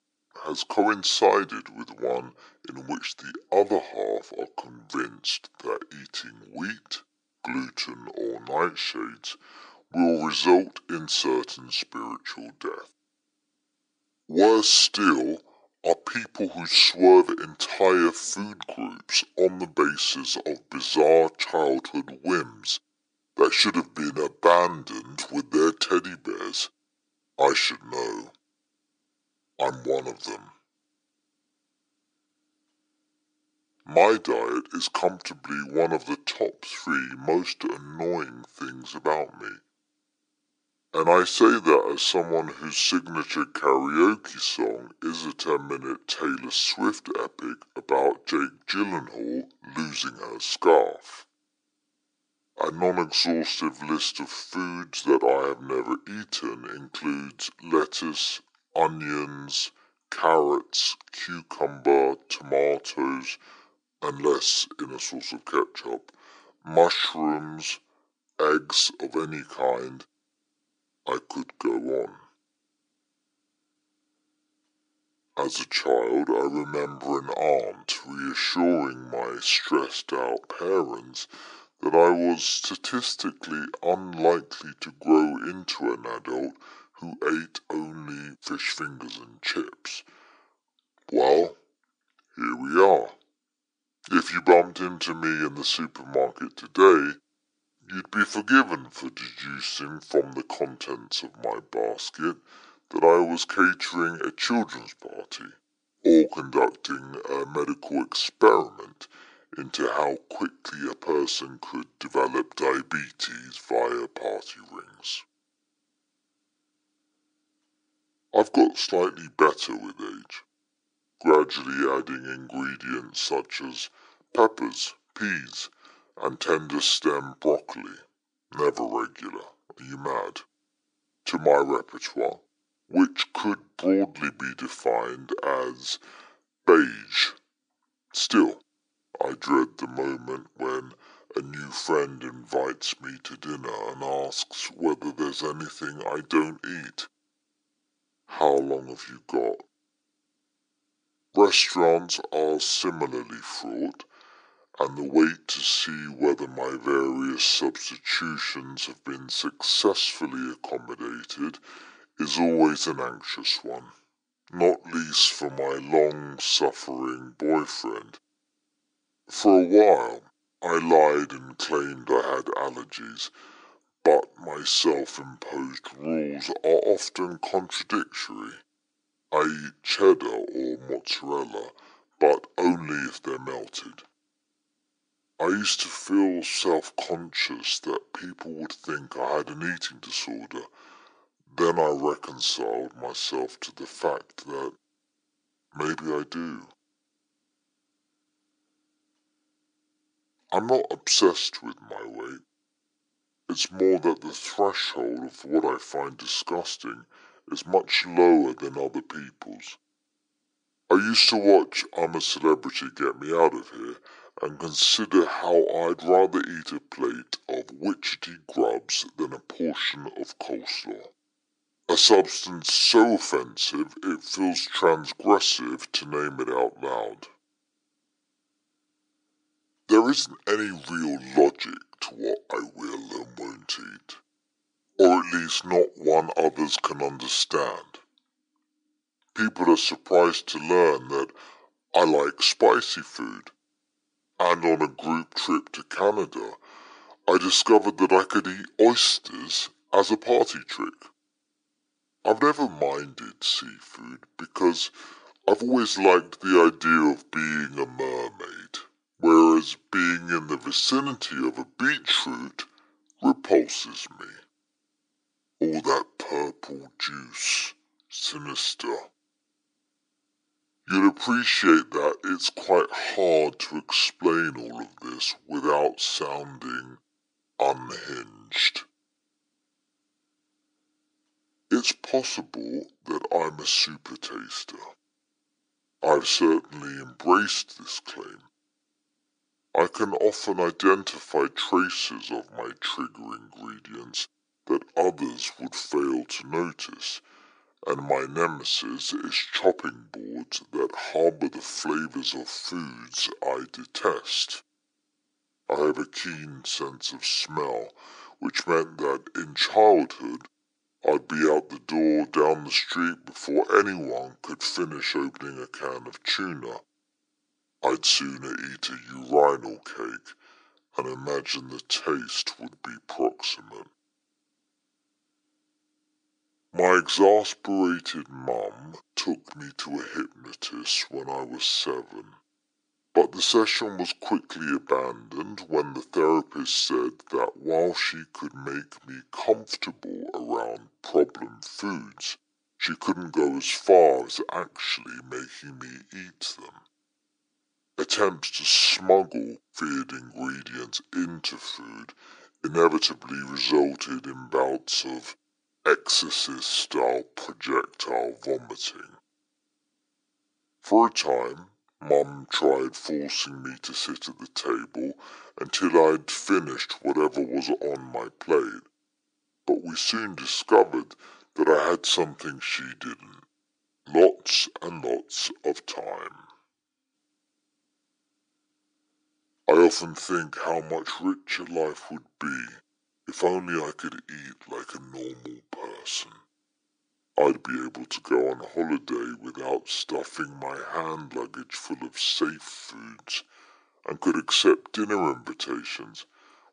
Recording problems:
wrong speed and pitch; too slow and too low; 0.7 times normal speed
thin; somewhat; fading below 300 Hz

